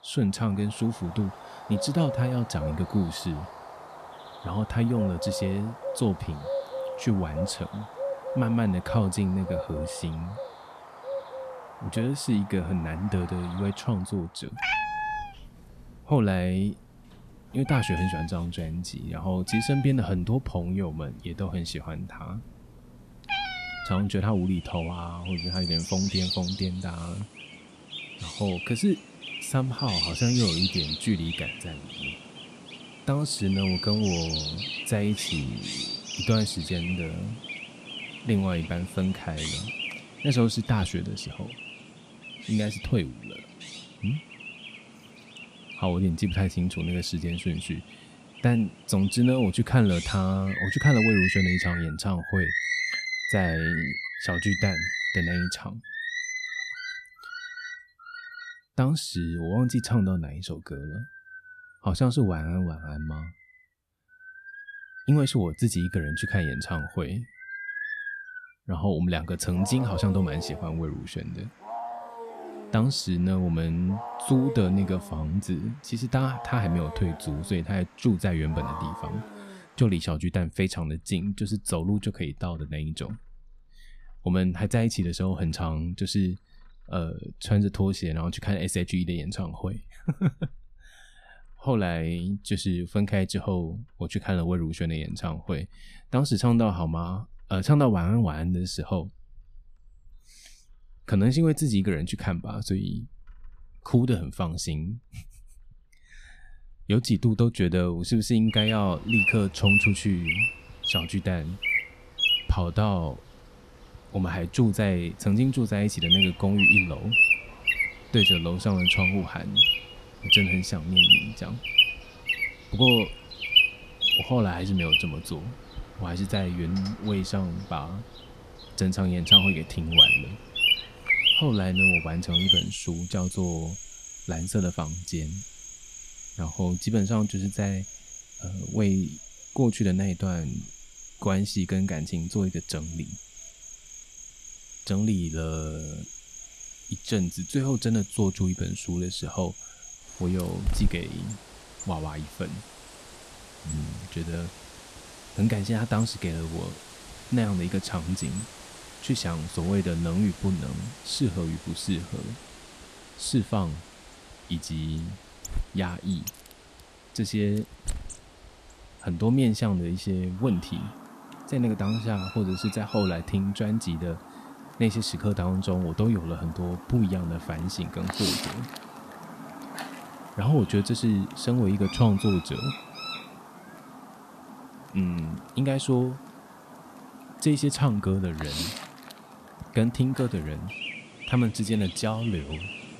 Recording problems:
animal sounds; very loud; throughout; 1 dB above the speech

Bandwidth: 14 kHz